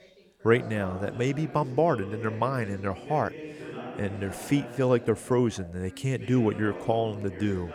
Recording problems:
background chatter; noticeable; throughout; 3 voices, 15 dB below the speech

